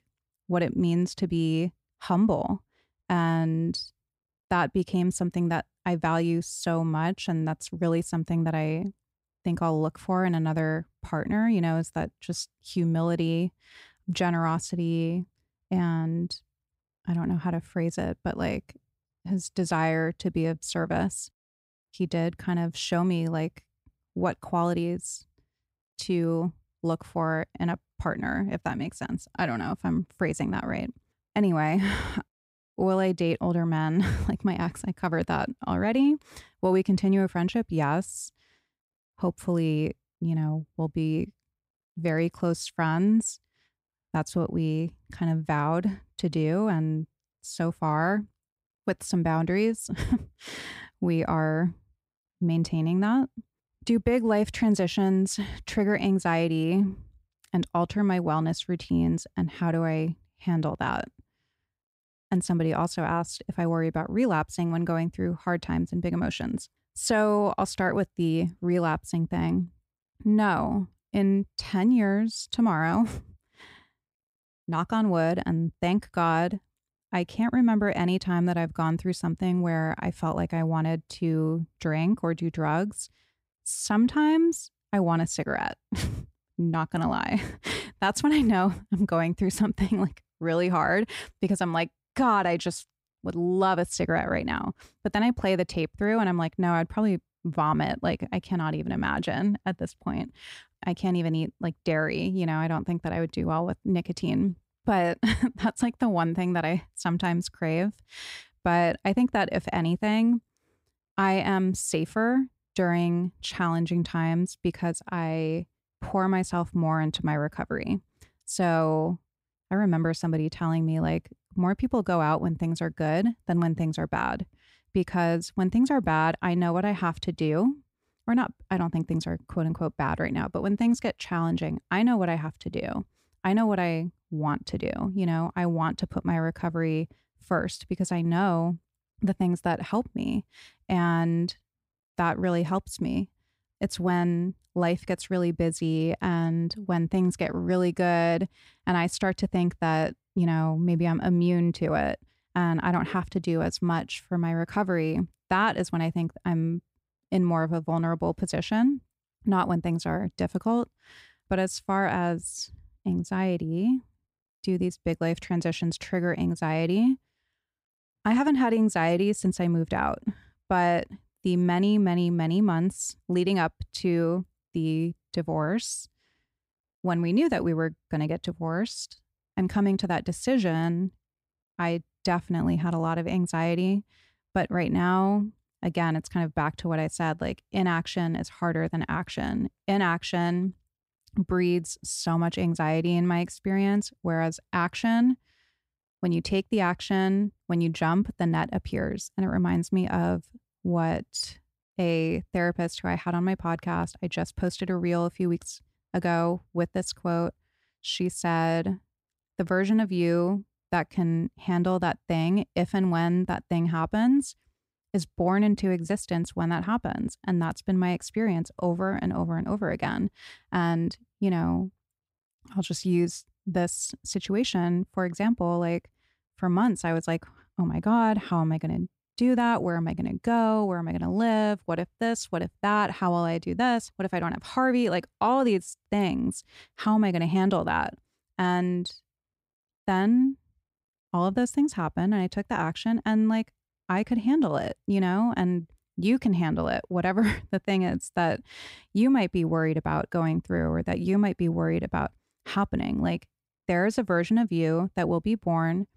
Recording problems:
none

